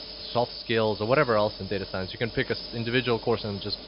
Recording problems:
high frequencies cut off; noticeable; nothing above 5.5 kHz
hiss; noticeable; throughout; 10 dB below the speech

